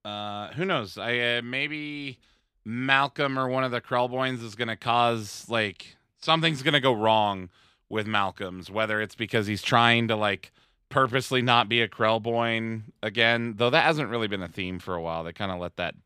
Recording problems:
none

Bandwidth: 15 kHz